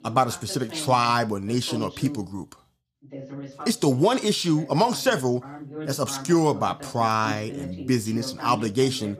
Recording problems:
voice in the background; noticeable; throughout; 15 dB below the speech

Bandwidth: 15 kHz